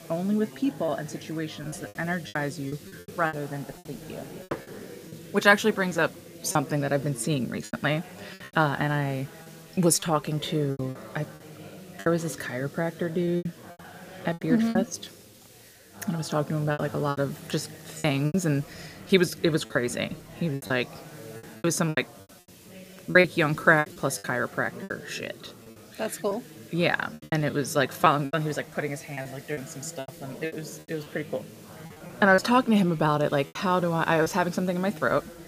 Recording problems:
chatter from many people; noticeable; throughout; 20 dB below the speech
hiss; faint; throughout; 25 dB below the speech
choppy; very; 10% of the speech affected

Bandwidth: 15 kHz